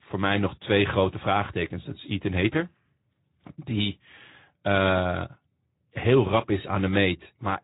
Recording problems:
high frequencies cut off; severe; nothing above 4 kHz
garbled, watery; slightly

